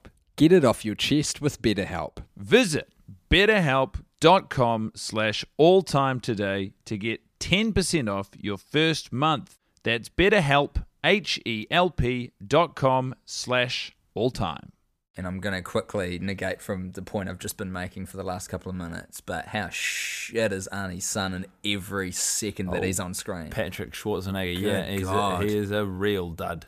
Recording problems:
none

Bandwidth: 15 kHz